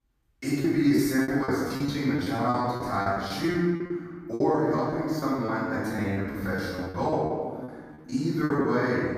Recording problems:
room echo; strong; dies away in 1.7 s
off-mic speech; far
choppy; very; 15% of the speech affected

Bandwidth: 14.5 kHz